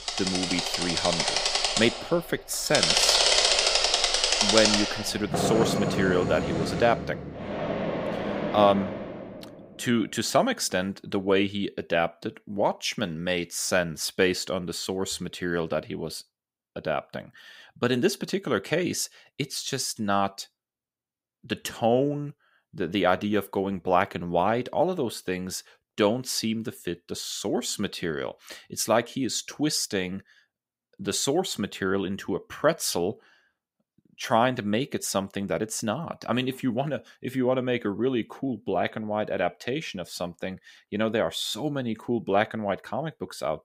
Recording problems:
machinery noise; very loud; until 9 s; 3 dB above the speech

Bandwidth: 15.5 kHz